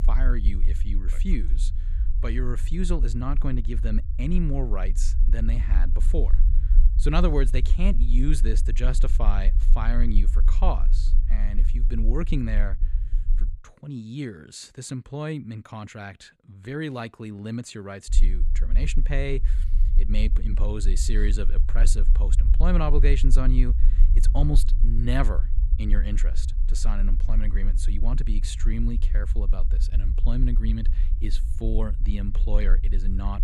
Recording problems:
low rumble; noticeable; until 14 s and from 18 s on; 15 dB below the speech

